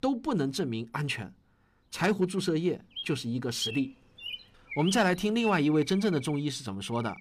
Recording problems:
animal sounds; noticeable; throughout; 10 dB below the speech

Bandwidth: 15 kHz